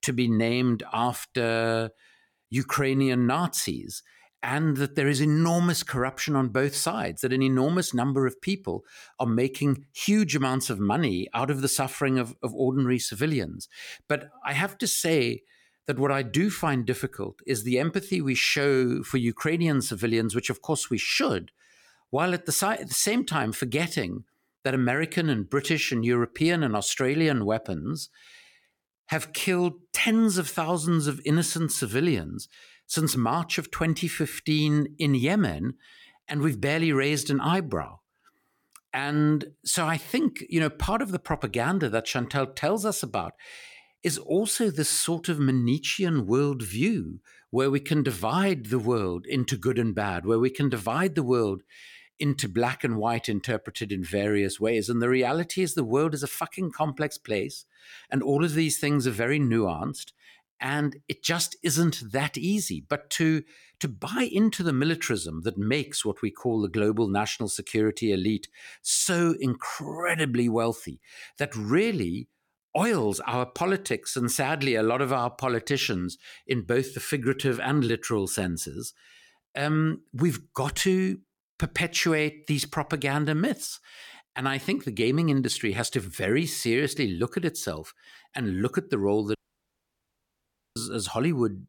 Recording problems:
audio cutting out; at 1:29 for 1.5 s

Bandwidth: 18 kHz